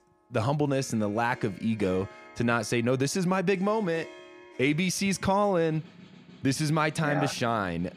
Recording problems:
background music; faint; throughout; 20 dB below the speech

